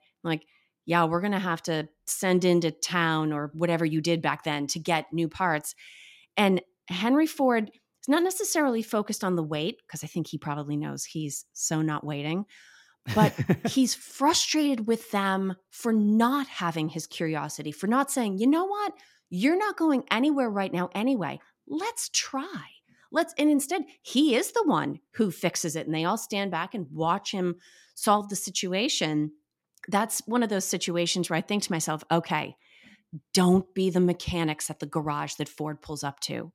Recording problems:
none

